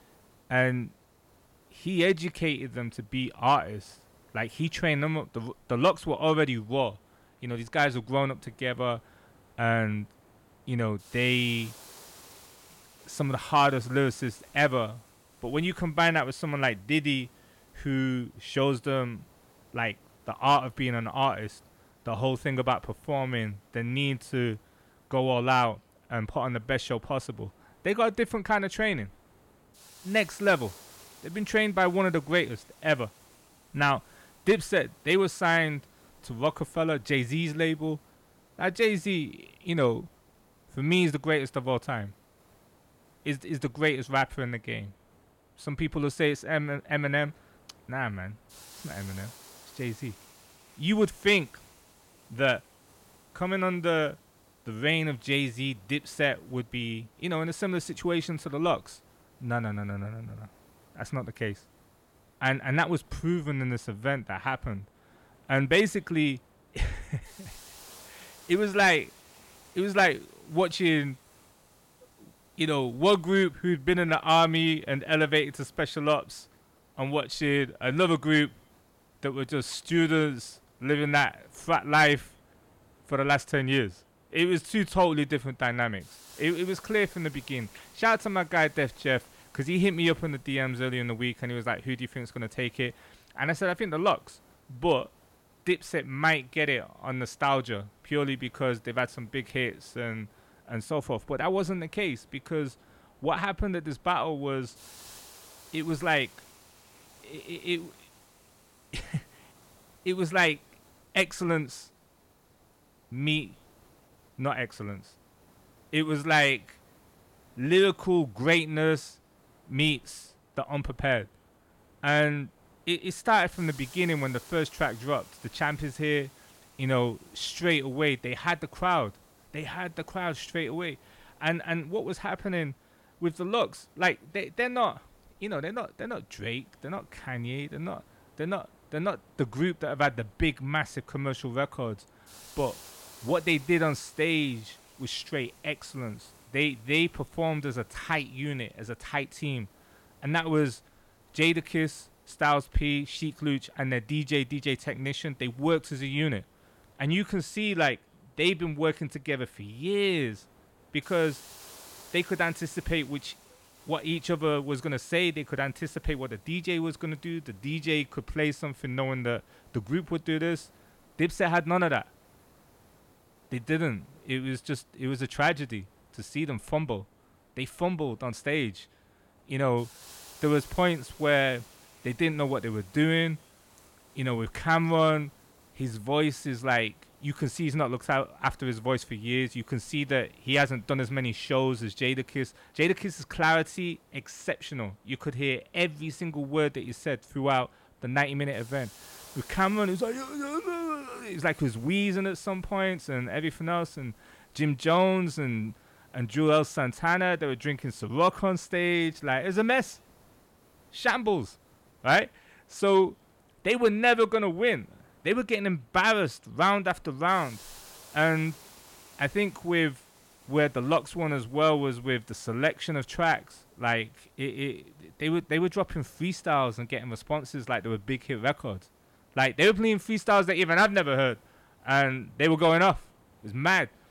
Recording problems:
hiss; faint; throughout; 25 dB below the speech

